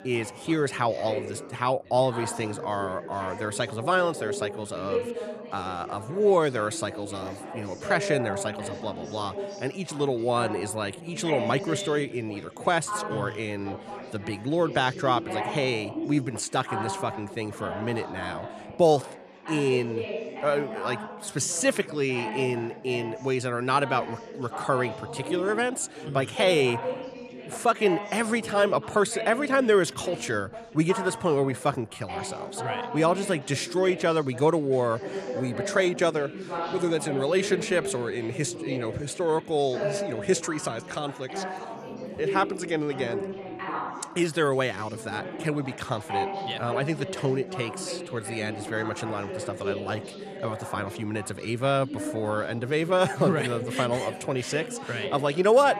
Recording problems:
background chatter; loud; throughout; 4 voices, 9 dB below the speech

